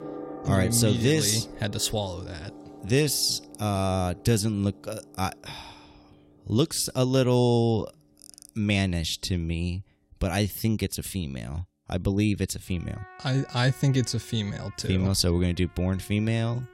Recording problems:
background music; noticeable; throughout; 20 dB below the speech

